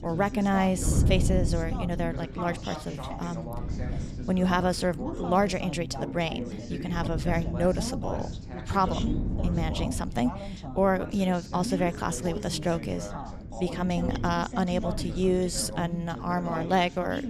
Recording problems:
background chatter; loud; throughout; 2 voices, 9 dB below the speech
wind noise on the microphone; occasional gusts; 15 dB below the speech

